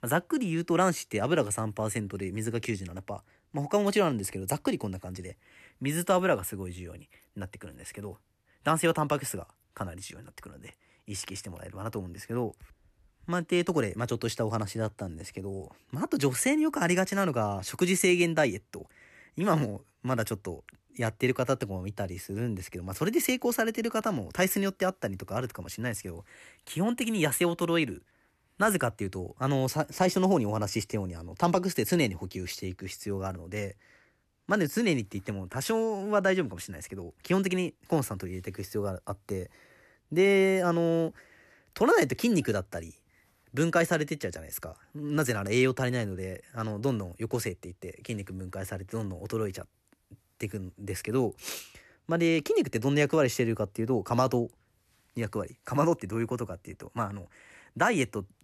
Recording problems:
none

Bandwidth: 13.5 kHz